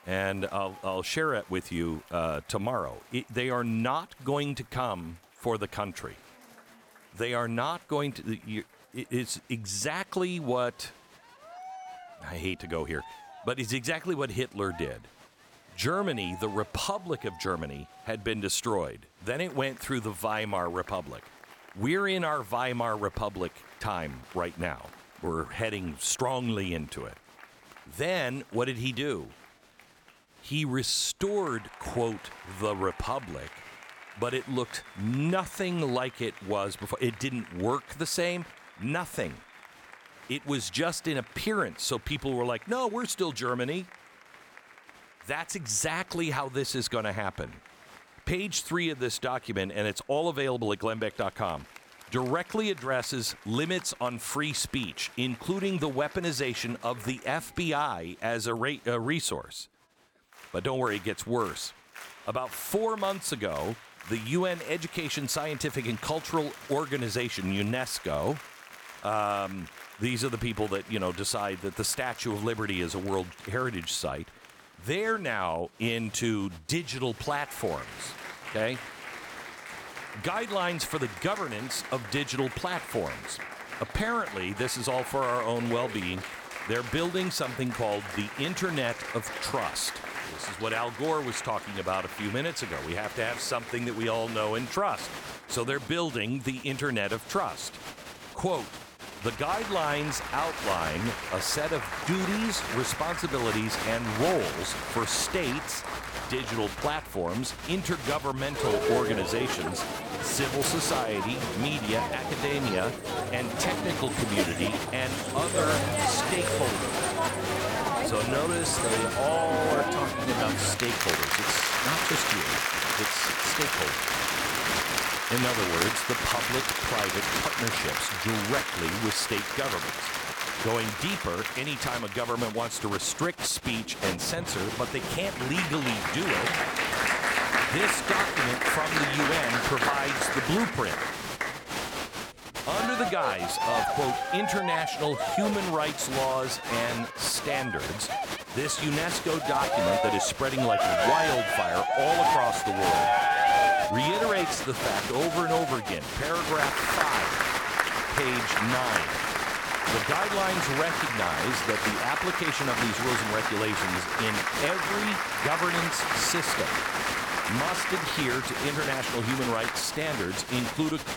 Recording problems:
crowd noise; very loud; throughout; 1 dB above the speech

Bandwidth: 18 kHz